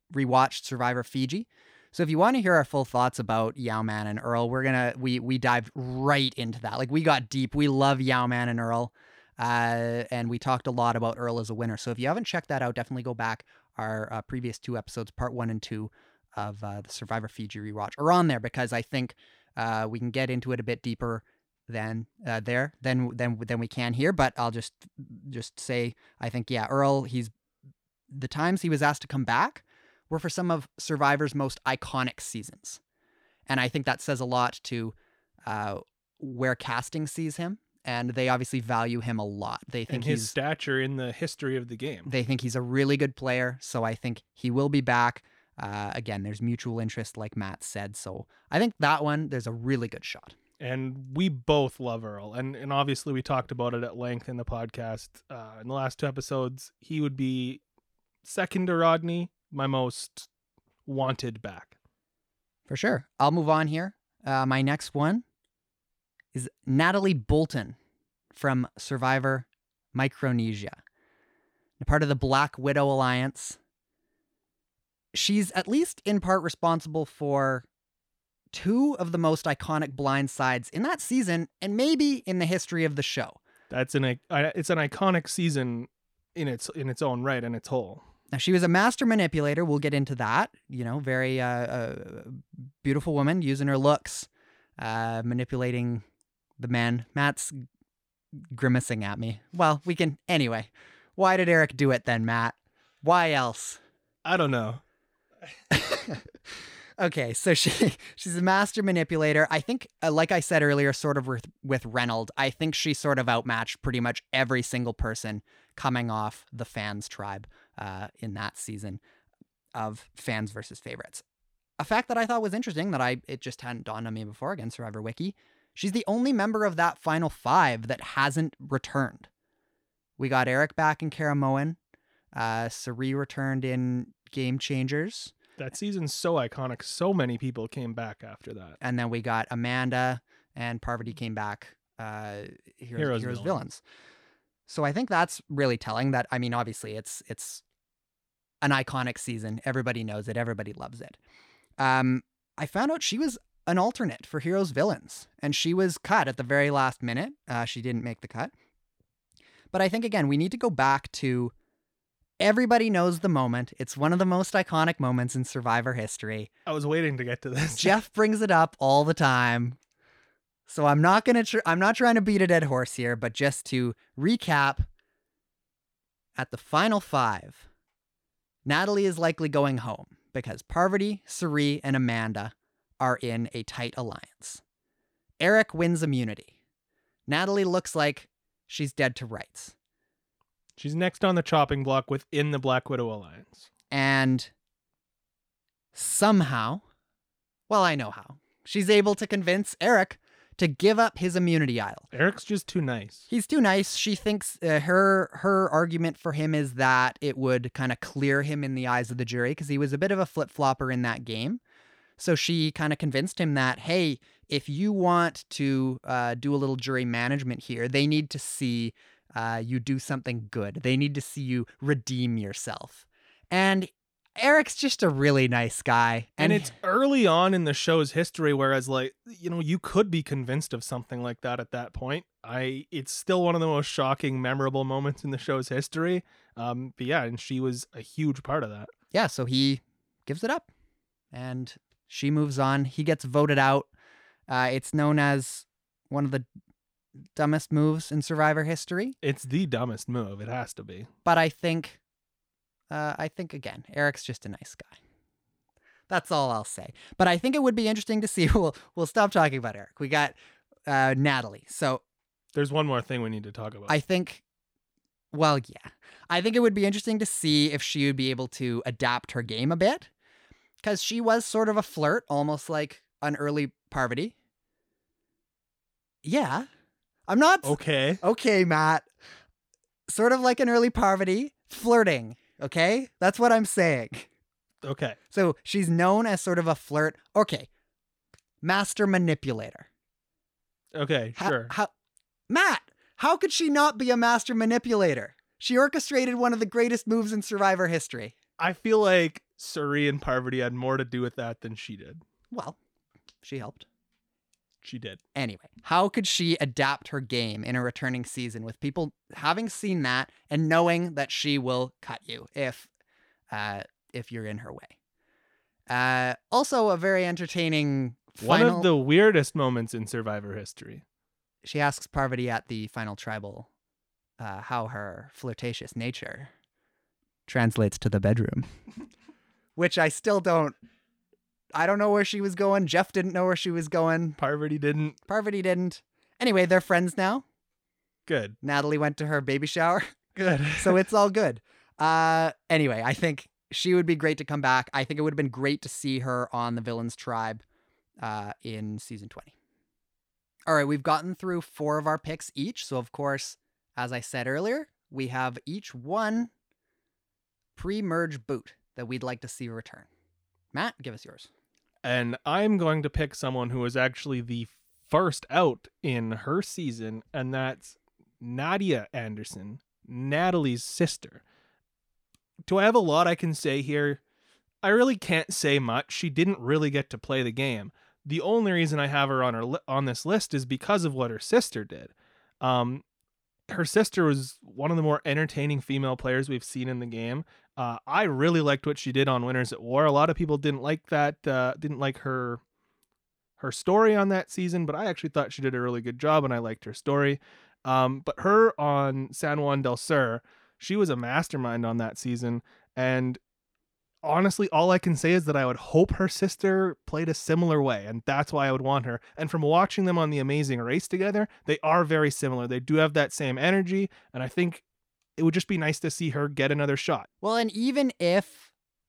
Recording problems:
none

